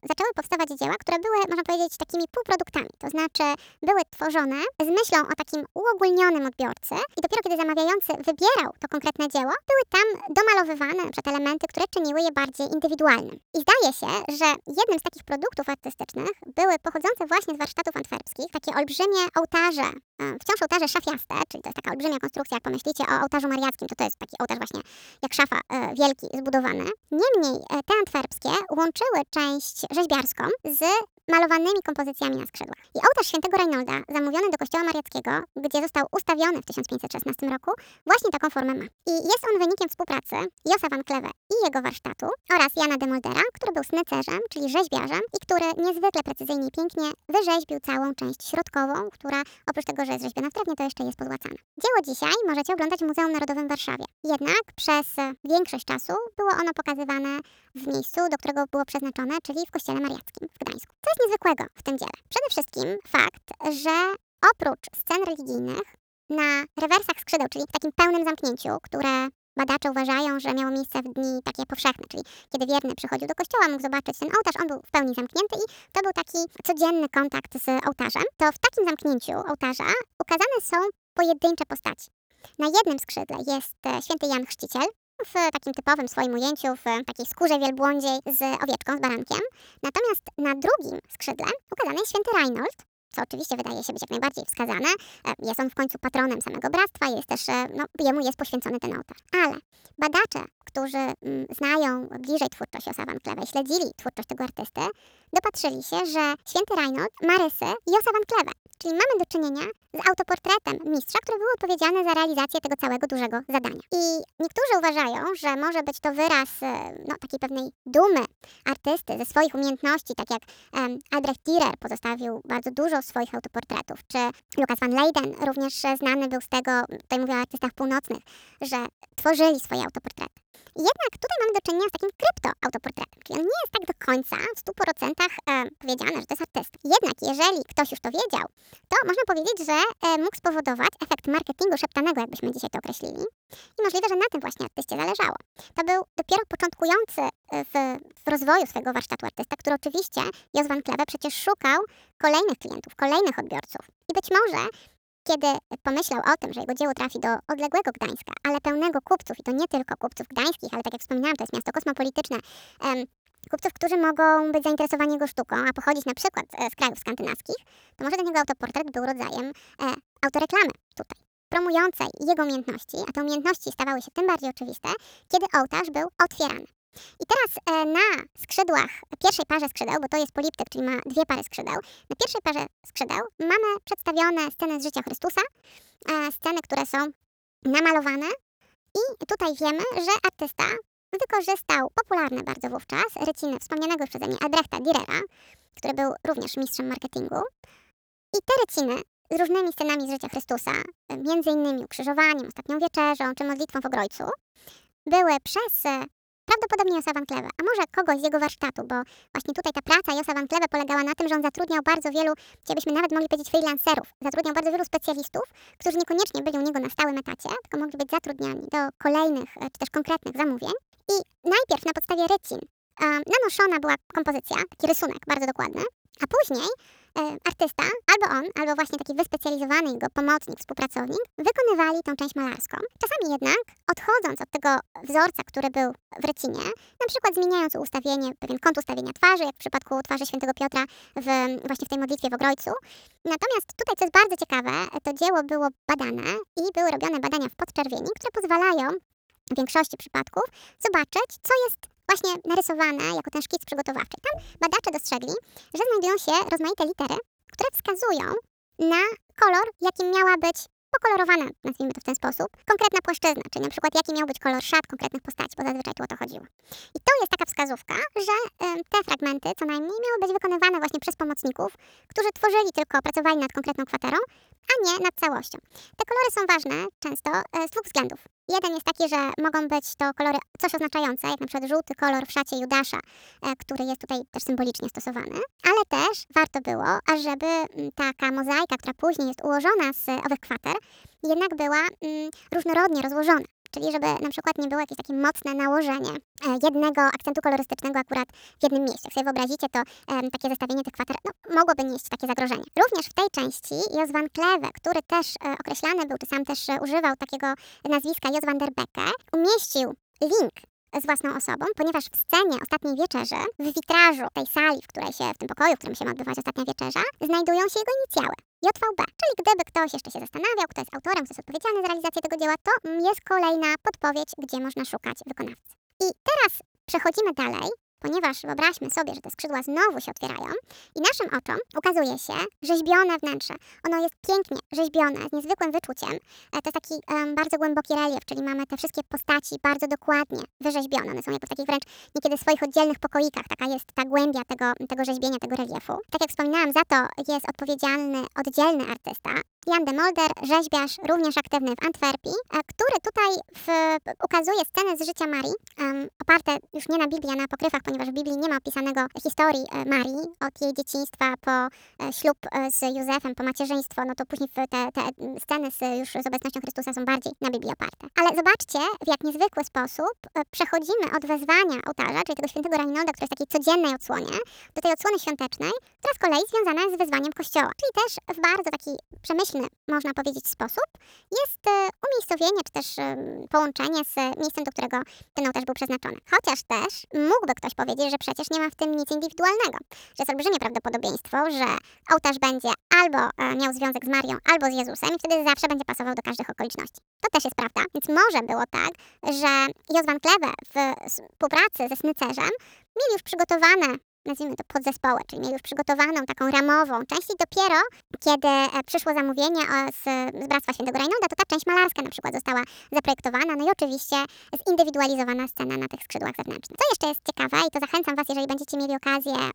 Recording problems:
wrong speed and pitch; too fast and too high; 1.6 times normal speed

